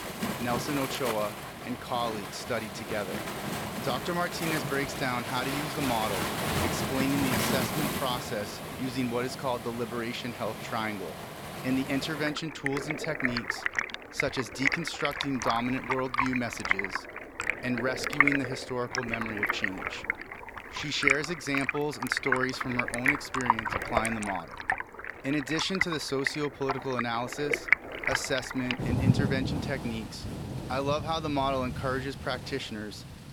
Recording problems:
rain or running water; very loud; throughout; 1 dB above the speech

